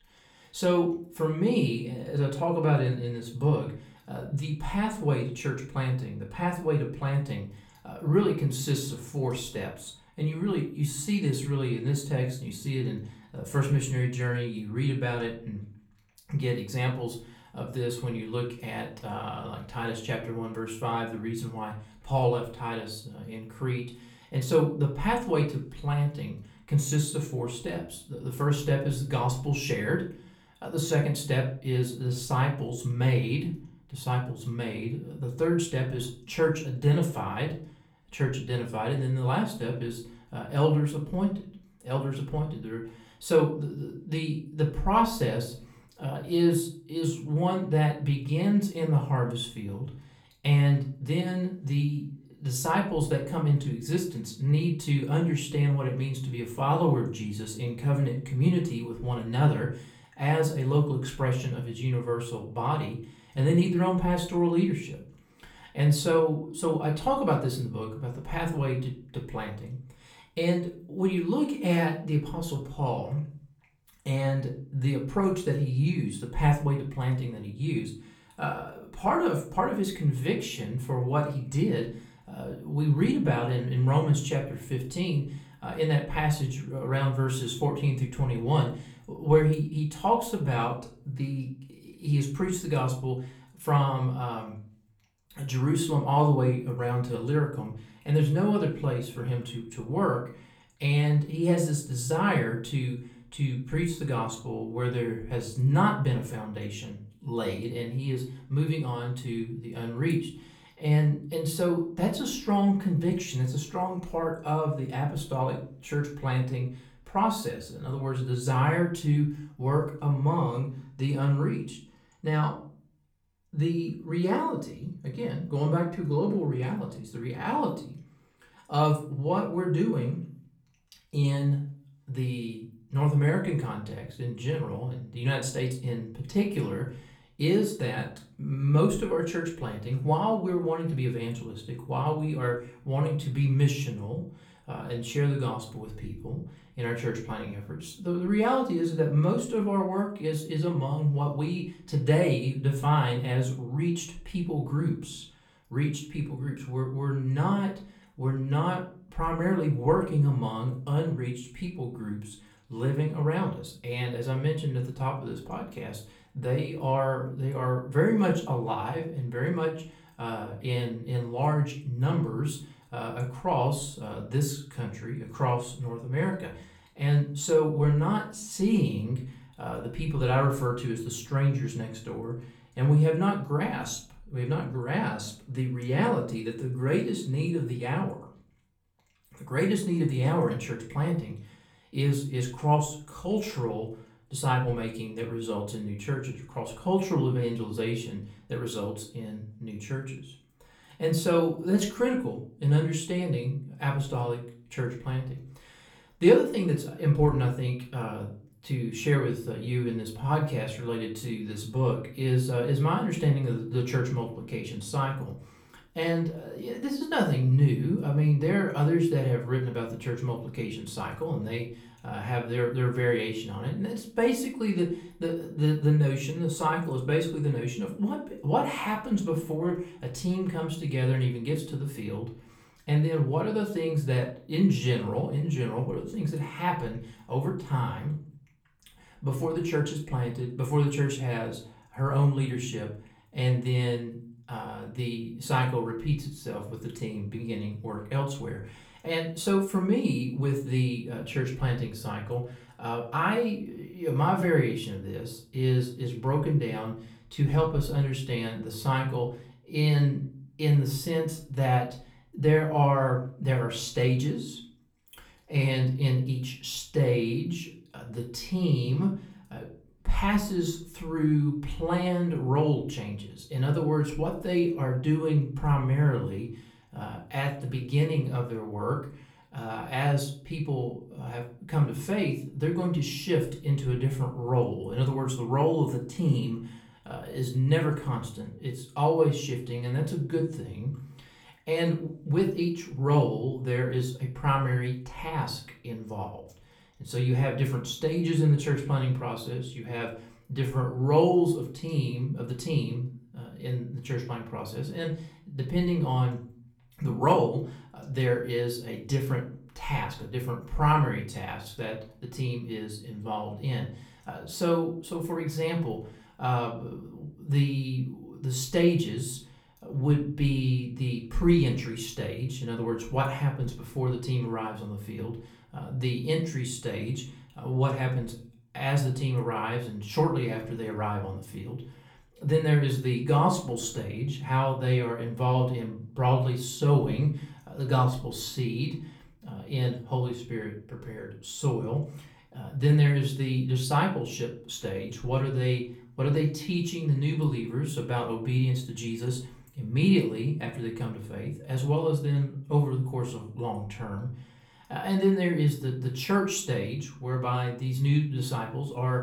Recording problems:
off-mic speech; far
room echo; slight; dies away in 0.4 s

